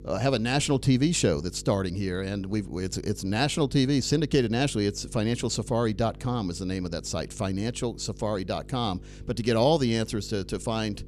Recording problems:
electrical hum; faint; throughout; 50 Hz, 25 dB below the speech

